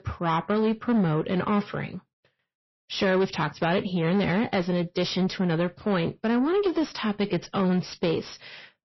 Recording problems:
distortion; slight; 10 dB below the speech
garbled, watery; slightly; nothing above 5.5 kHz

